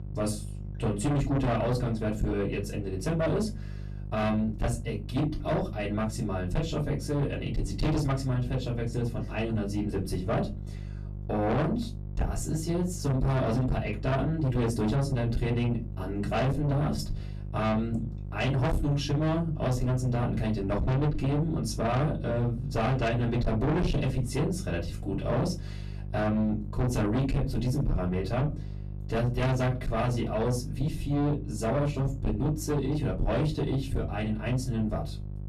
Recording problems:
distortion; heavy; 6 dB below the speech
off-mic speech; far
room echo; very slight; dies away in 0.2 s
electrical hum; noticeable; throughout; 50 Hz, 20 dB below the speech

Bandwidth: 13.5 kHz